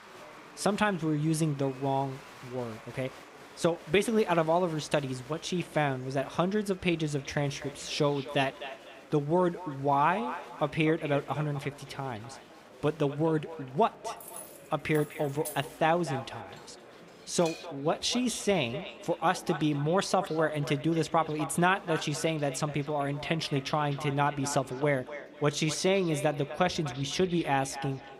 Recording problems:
echo of what is said; noticeable; from 7 s on; 250 ms later, 15 dB below the speech
murmuring crowd; faint; throughout; 20 dB below the speech
jangling keys; faint; from 14 to 16 s; peak 10 dB below the speech
clattering dishes; faint; from 17 to 18 s; peak 15 dB below the speech

